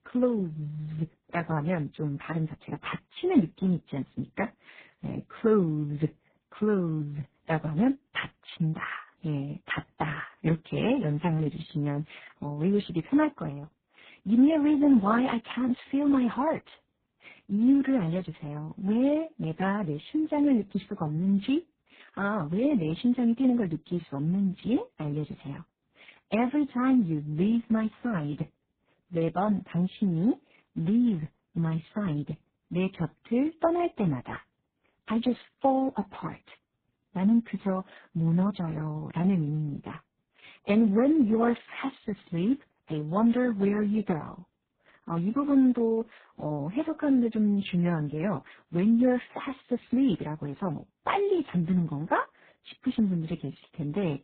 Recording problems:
garbled, watery; badly; nothing above 4 kHz
high frequencies cut off; slight

